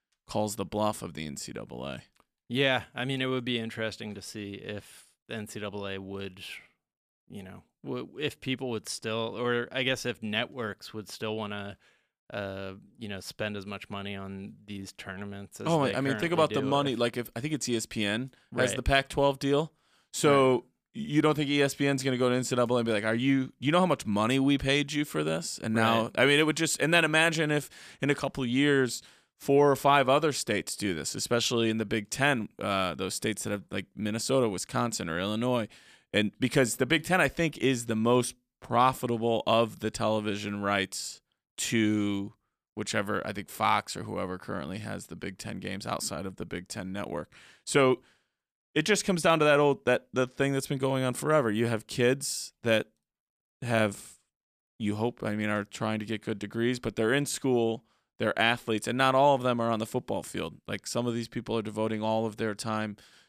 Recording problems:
none

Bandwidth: 14.5 kHz